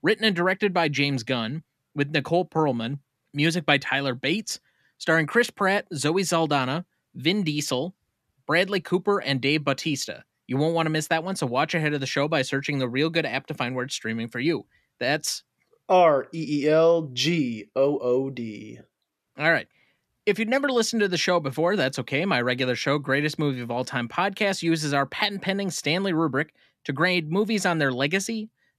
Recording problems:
none

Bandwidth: 14.5 kHz